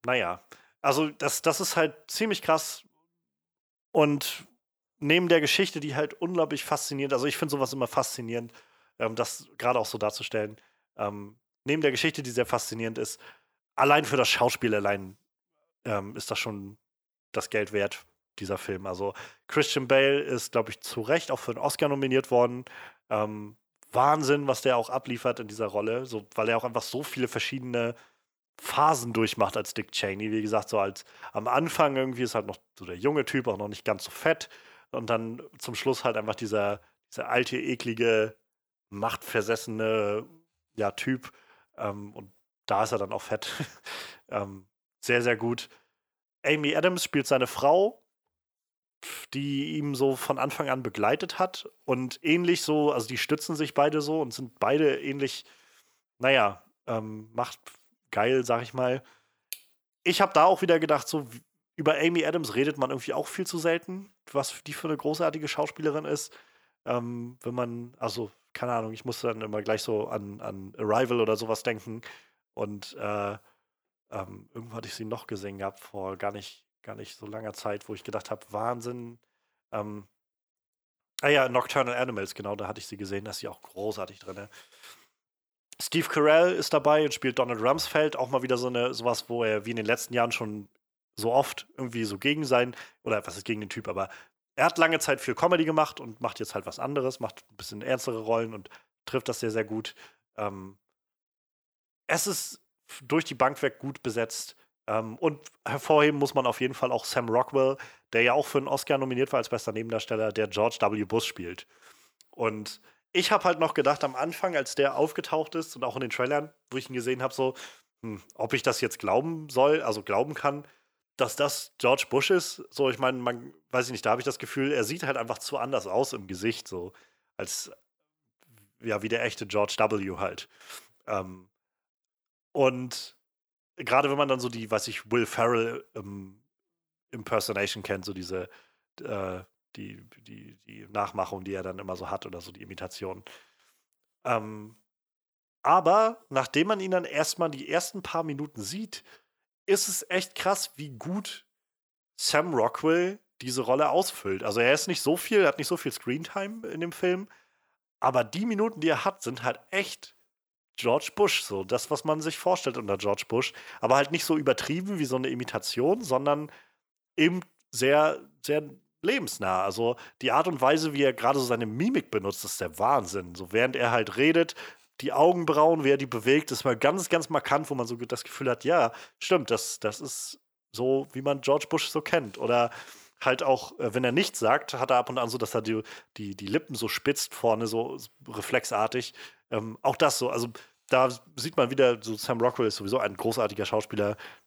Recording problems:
none

